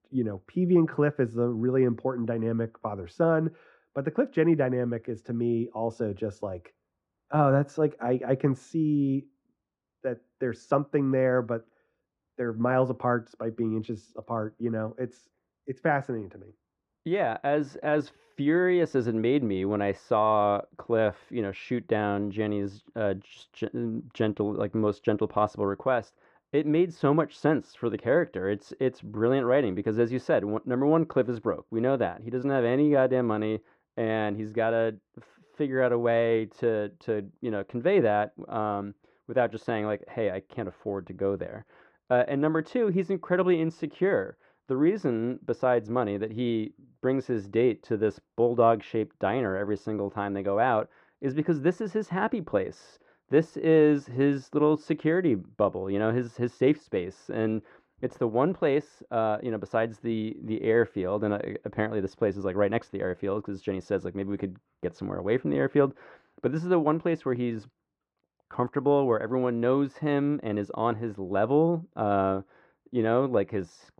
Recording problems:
muffled; very; fading above 3 kHz

